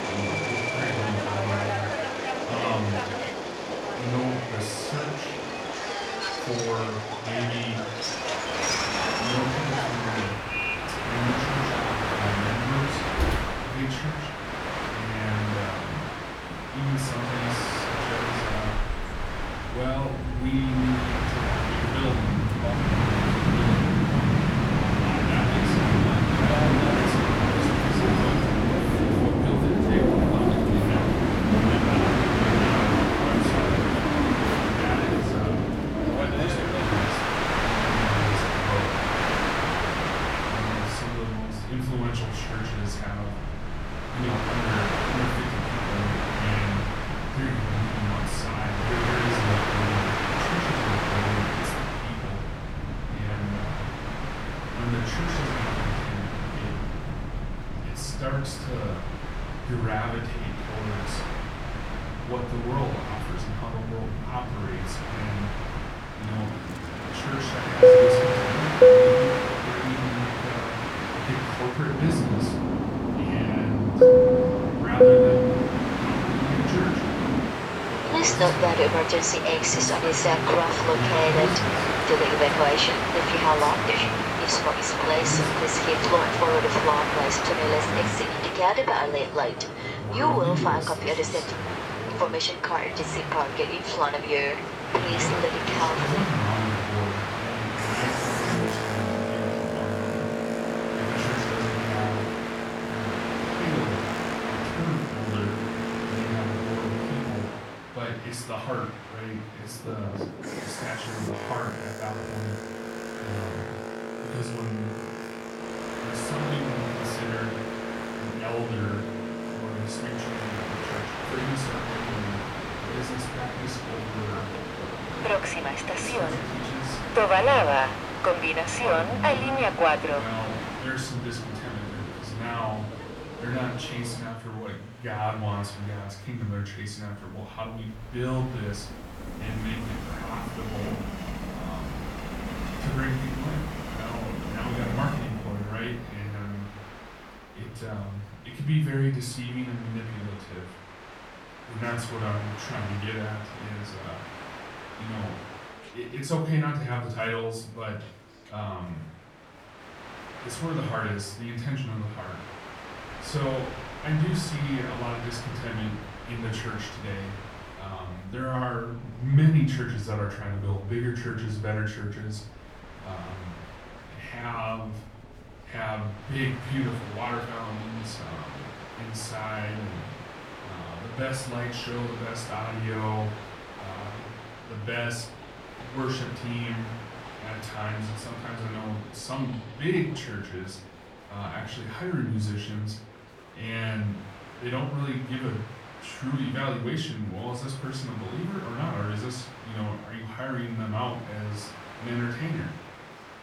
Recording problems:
off-mic speech; far
room echo; slight; dies away in 0.4 s
train or aircraft noise; very loud; throughout; 6 dB above the speech
murmuring crowd; faint; throughout; 20 dB below the speech

